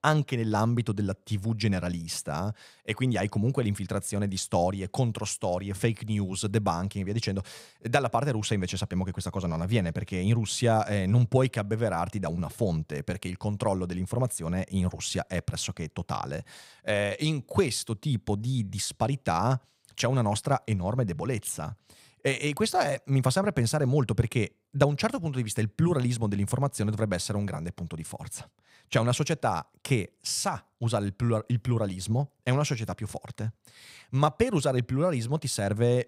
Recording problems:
none

